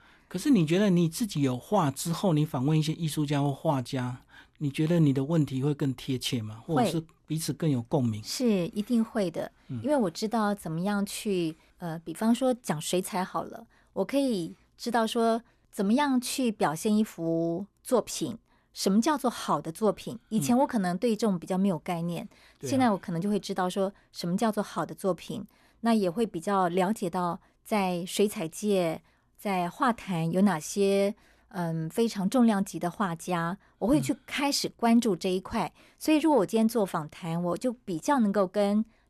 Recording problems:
none

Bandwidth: 13.5 kHz